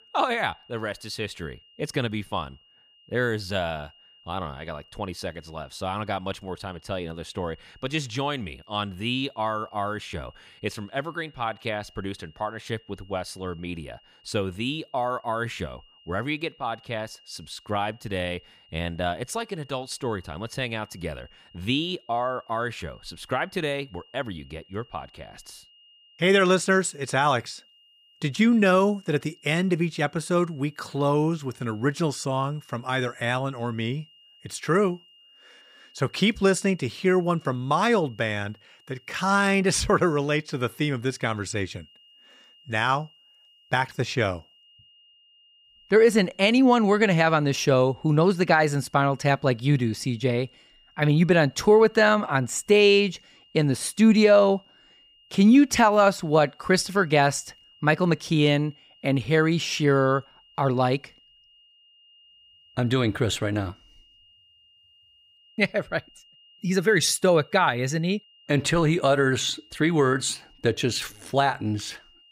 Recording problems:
high-pitched whine; faint; throughout; 3 kHz, 30 dB below the speech

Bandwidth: 15.5 kHz